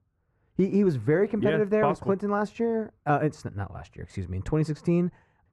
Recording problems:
muffled; very; fading above 3 kHz

